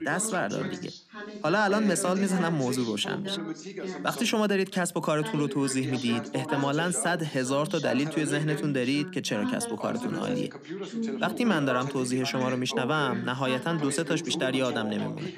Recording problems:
background chatter; loud; throughout; 2 voices, 8 dB below the speech

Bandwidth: 14.5 kHz